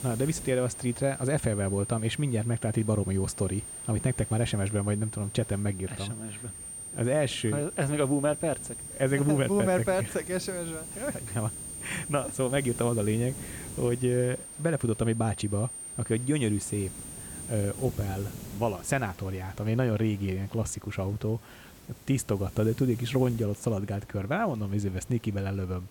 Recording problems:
high-pitched whine; loud; until 18 s; 9 kHz, 9 dB below the speech
hiss; noticeable; throughout; 20 dB below the speech

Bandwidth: 17 kHz